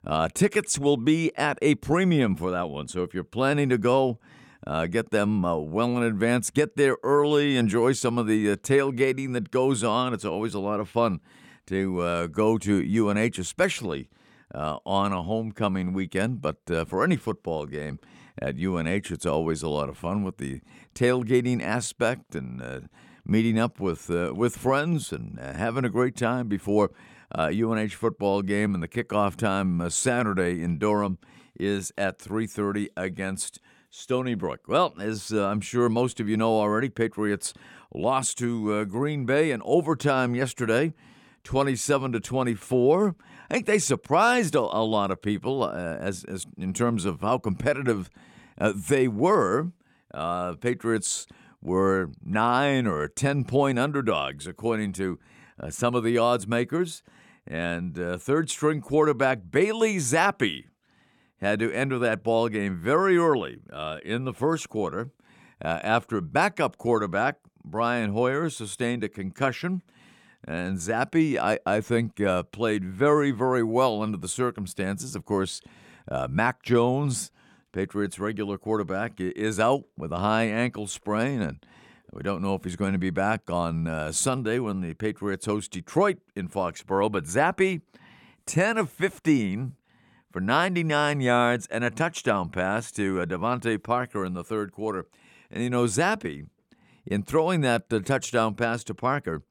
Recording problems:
none

